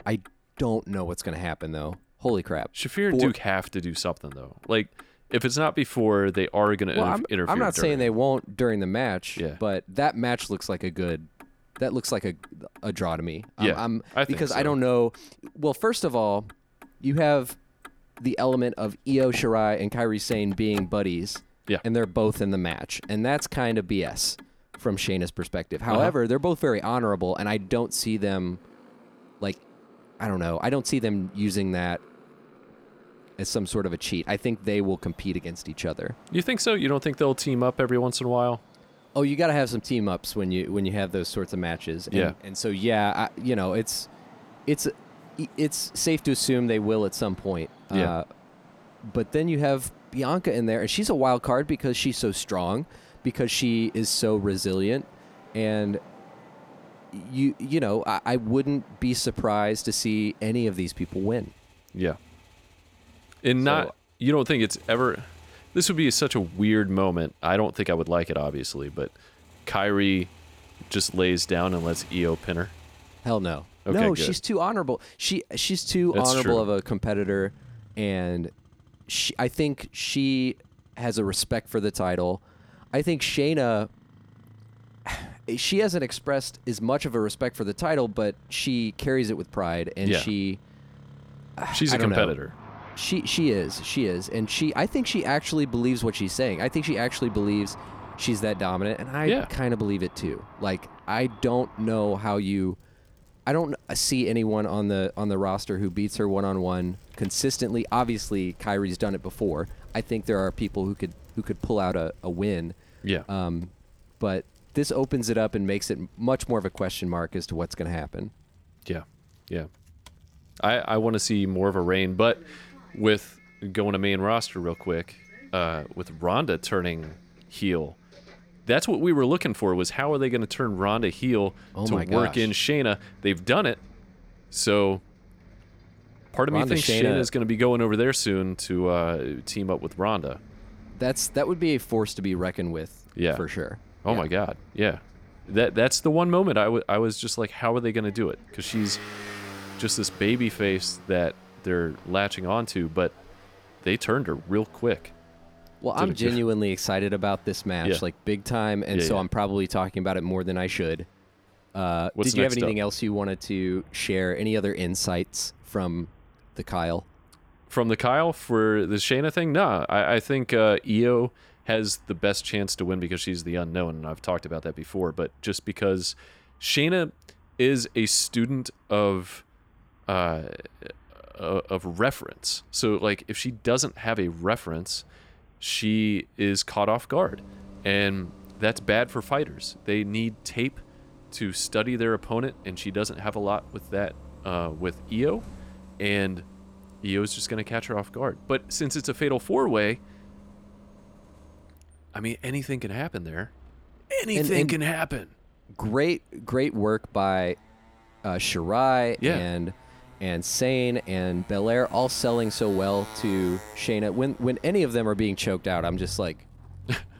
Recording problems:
traffic noise; faint; throughout; 25 dB below the speech

